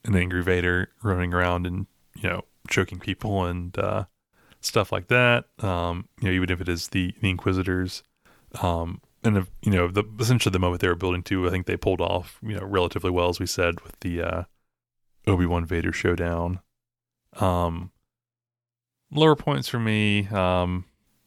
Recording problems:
none

